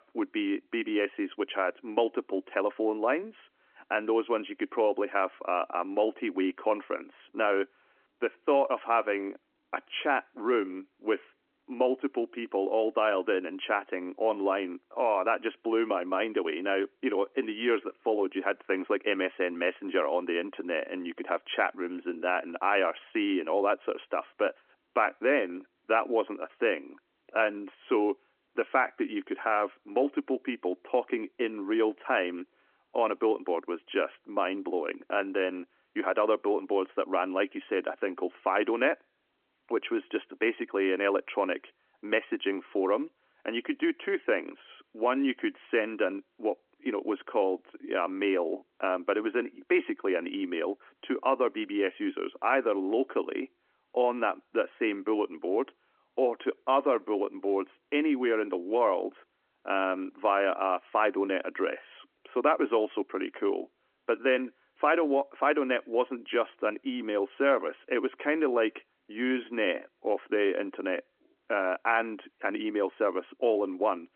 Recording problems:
phone-call audio

